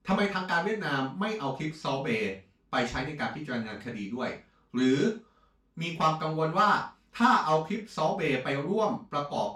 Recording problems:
off-mic speech; far
room echo; slight; dies away in 0.3 s

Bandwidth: 16 kHz